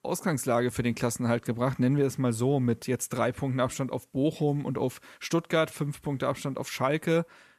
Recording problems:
none

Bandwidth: 14 kHz